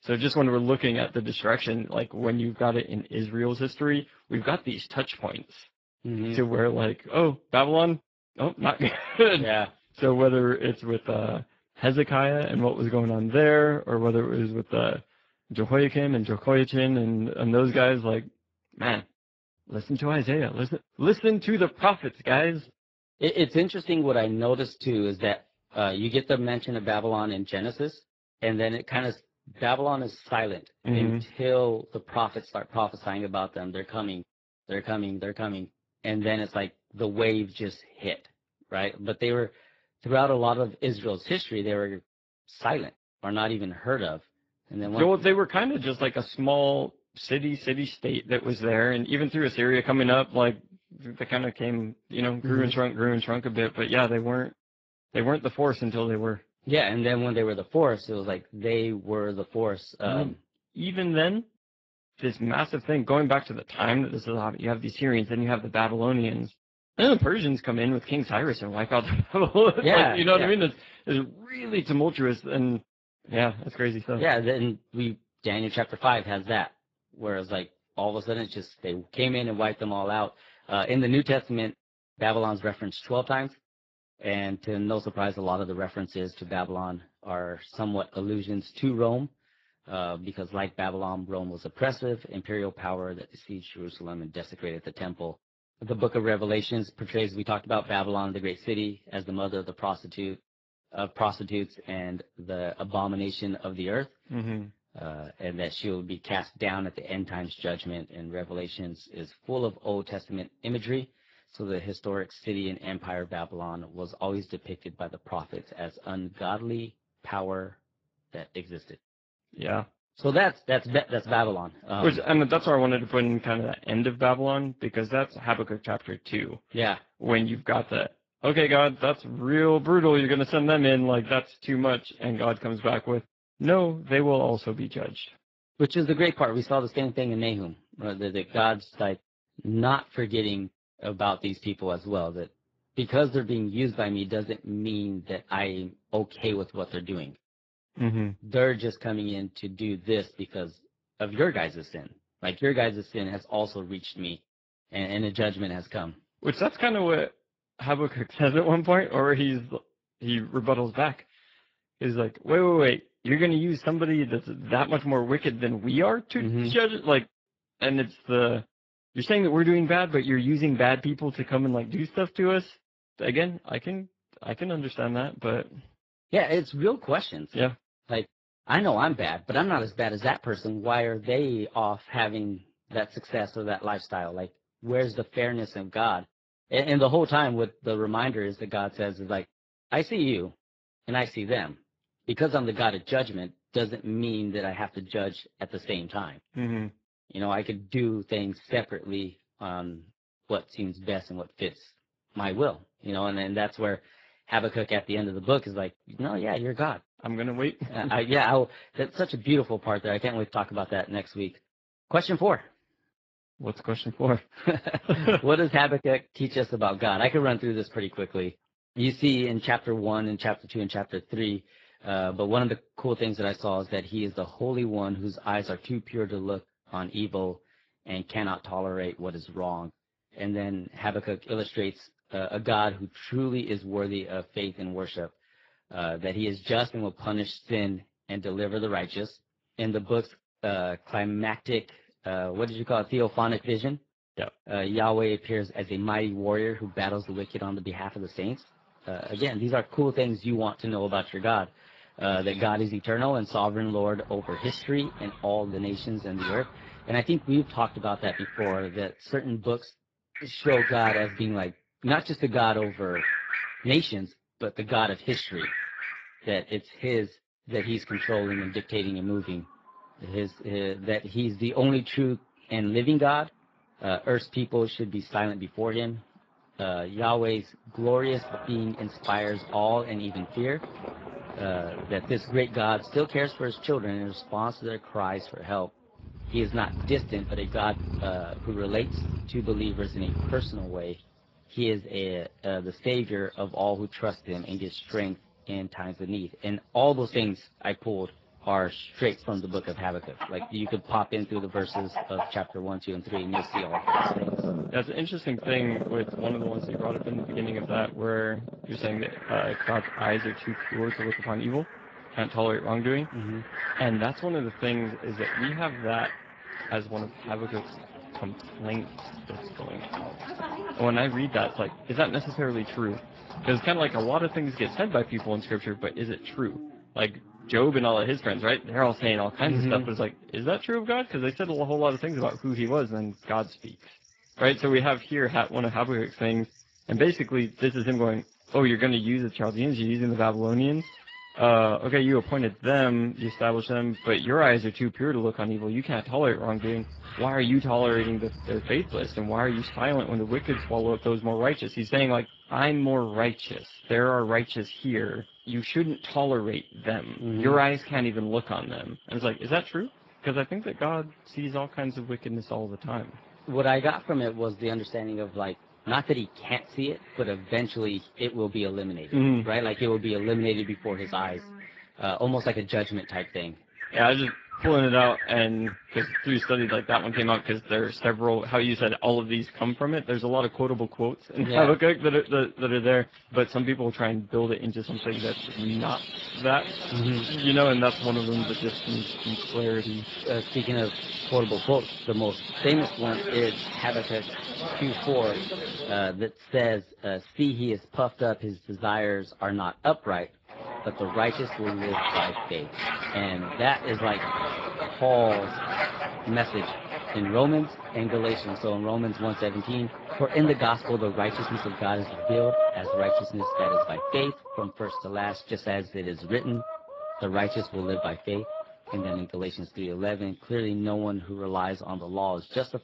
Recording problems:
garbled, watery; badly
animal sounds; loud; from 4:06 on; 7 dB below the speech

